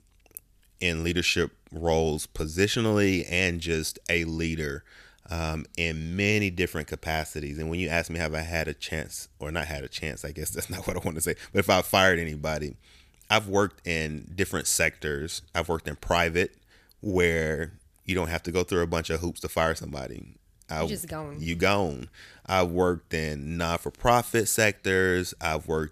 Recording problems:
none

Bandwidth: 14.5 kHz